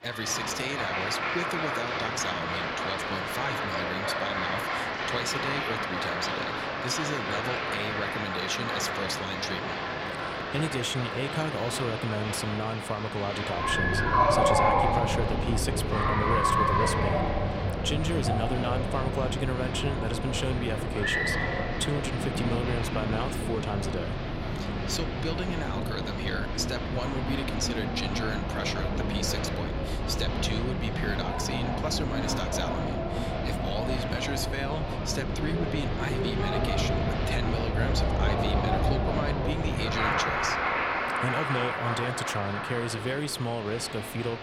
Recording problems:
crowd noise; very loud; throughout; 4 dB above the speech

